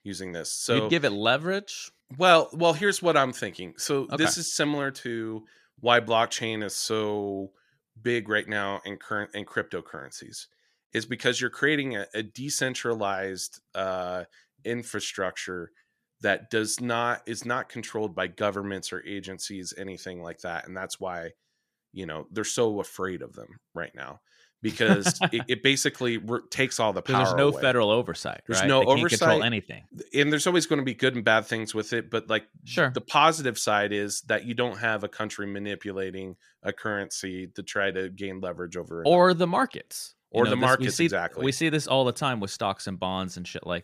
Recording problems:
none

